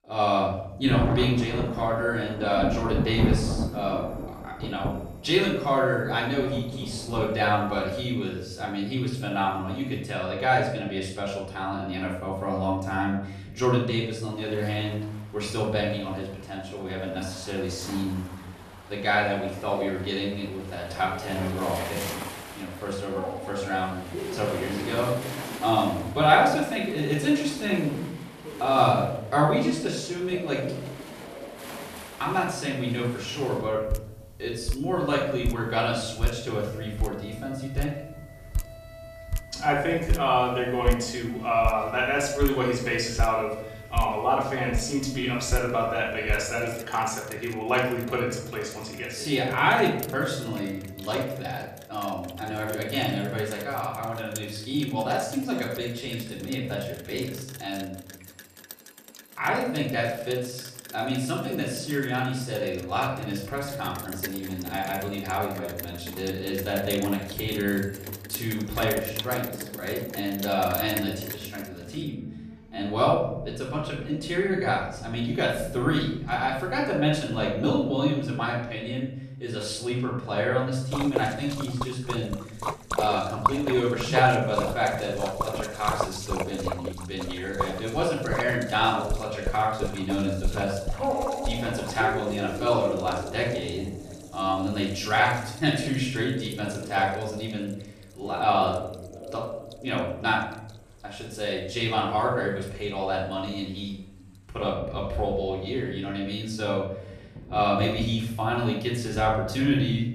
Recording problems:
off-mic speech; far
room echo; noticeable; dies away in 0.7 s
rain or running water; loud; throughout; 9 dB below the speech
alarms or sirens; noticeable; throughout; 15 dB below the speech

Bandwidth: 14.5 kHz